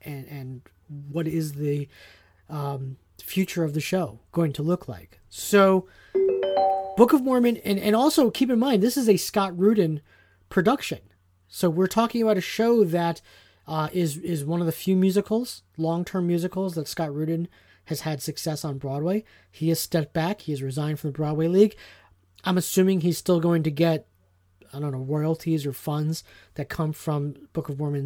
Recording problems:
phone ringing; loud; at 6 s; peak 2 dB above the speech
abrupt cut into speech; at the end

